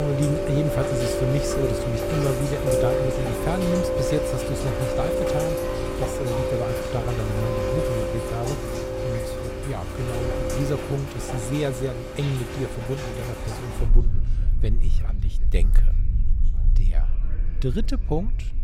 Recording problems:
rain or running water; very loud; throughout; 2 dB above the speech
background chatter; faint; throughout; 4 voices, 20 dB below the speech
abrupt cut into speech; at the start

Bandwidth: 16 kHz